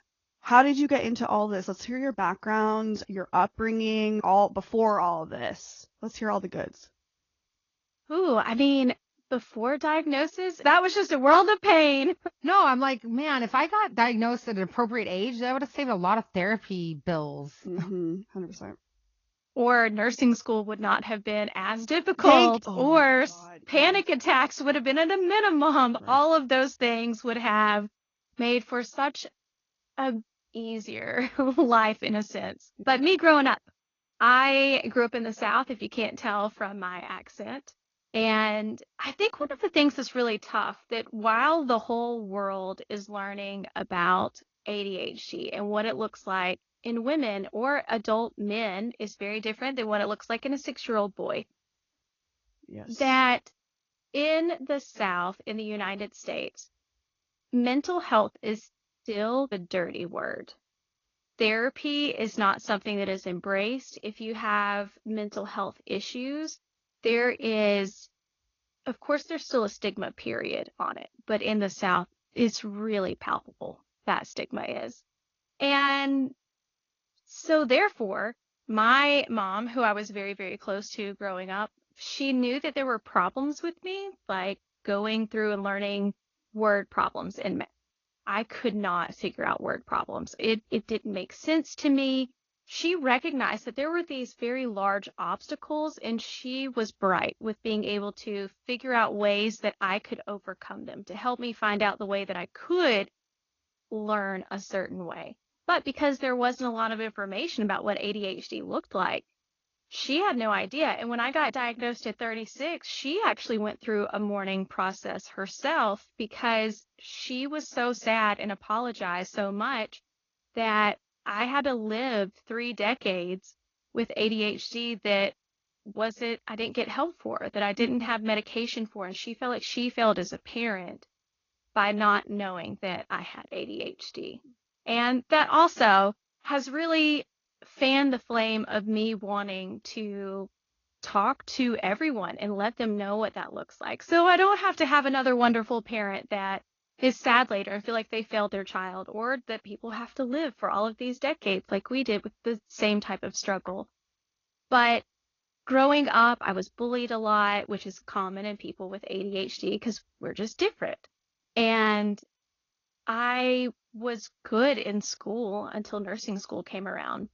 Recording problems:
garbled, watery; slightly; nothing above 6.5 kHz

